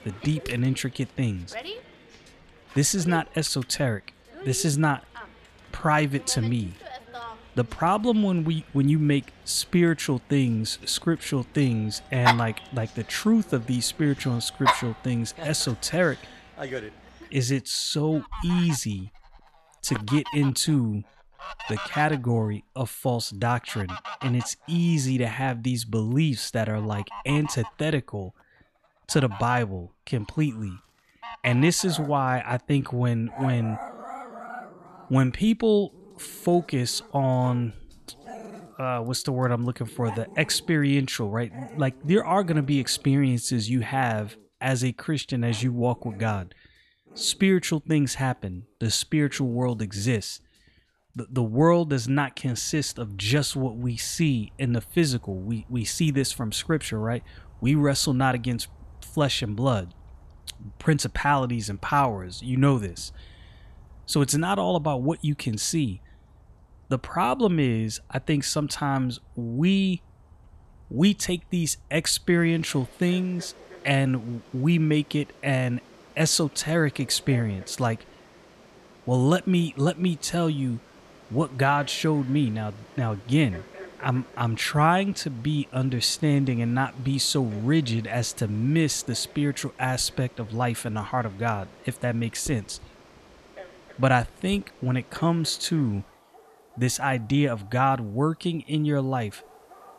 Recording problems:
animal sounds; noticeable; throughout; 15 dB below the speech

